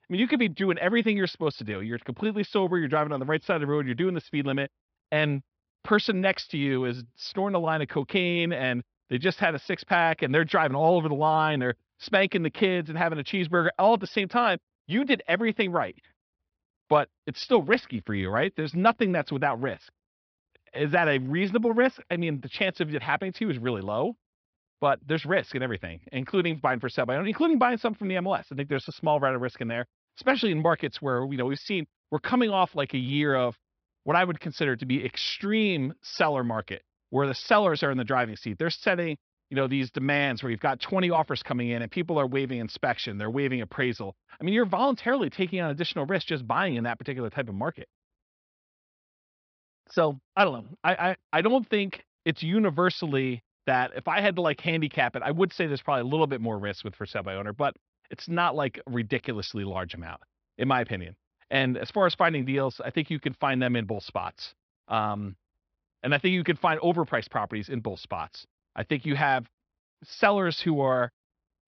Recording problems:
high frequencies cut off; noticeable; nothing above 5.5 kHz

